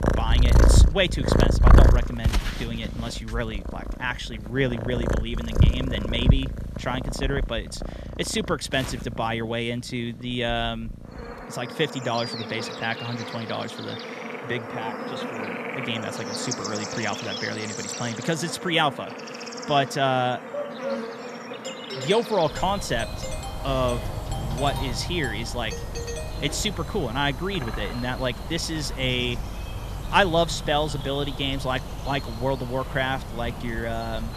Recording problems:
animal sounds; loud; throughout; 1 dB below the speech
dog barking; noticeable; at 21 s; peak 4 dB below the speech
doorbell; noticeable; from 22 to 27 s; peak 7 dB below the speech

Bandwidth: 14 kHz